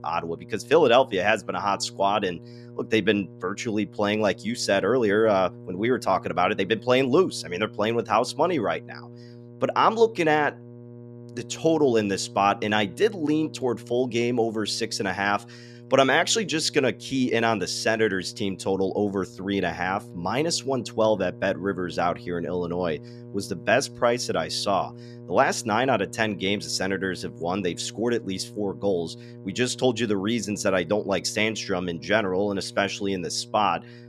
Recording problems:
electrical hum; faint; throughout; 60 Hz, 25 dB below the speech

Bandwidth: 13.5 kHz